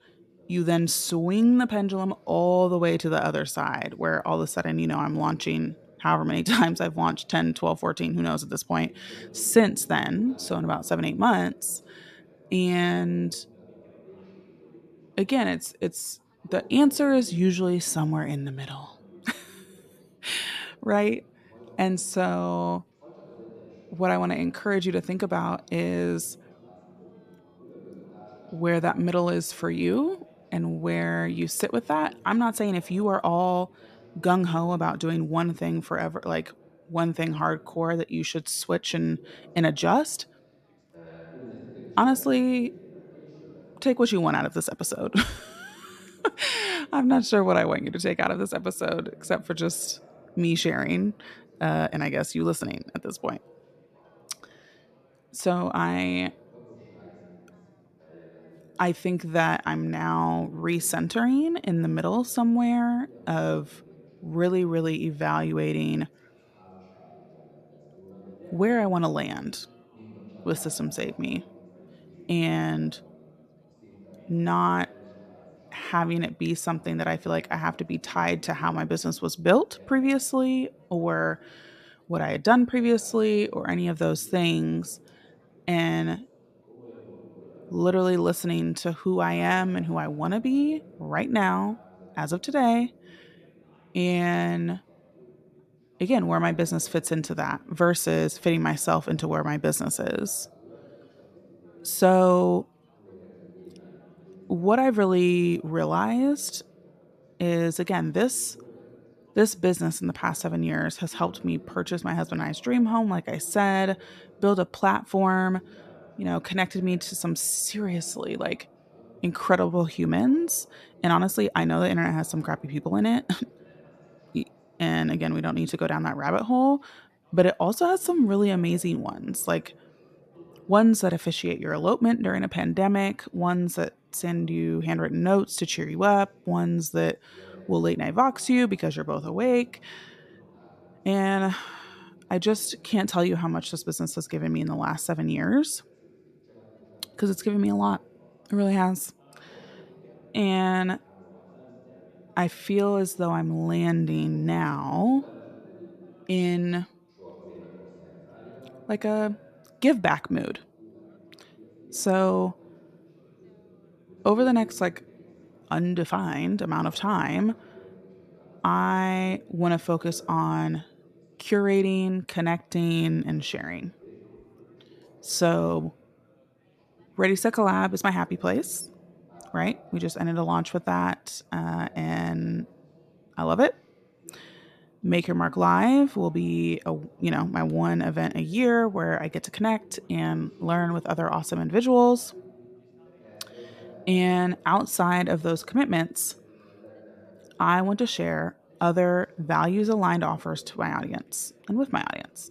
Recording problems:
background chatter; faint; throughout; 3 voices, 25 dB below the speech

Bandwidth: 14 kHz